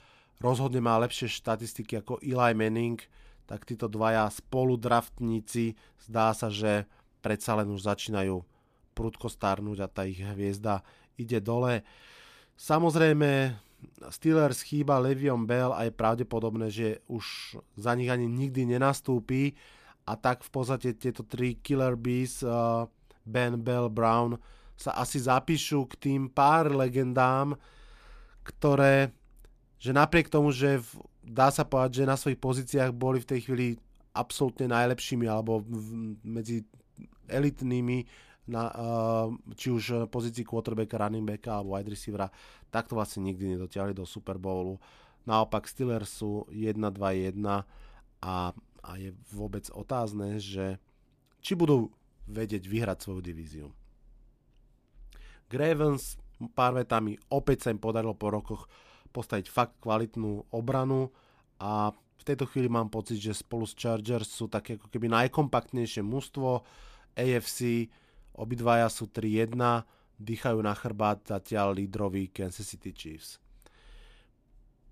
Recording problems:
none

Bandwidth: 14.5 kHz